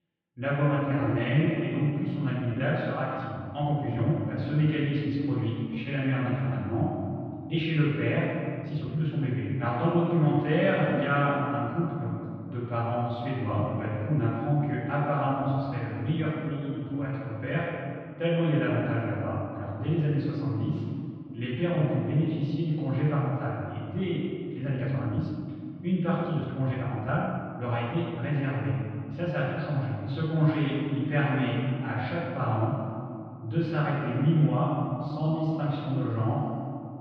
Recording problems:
room echo; strong; dies away in 2.4 s
off-mic speech; far
muffled; very; fading above 3.5 kHz
uneven, jittery; strongly; from 1 to 36 s

